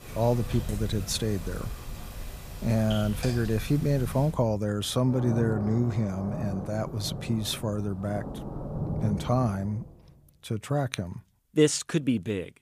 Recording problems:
rain or running water; loud; until 9.5 s; 9 dB below the speech

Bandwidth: 15 kHz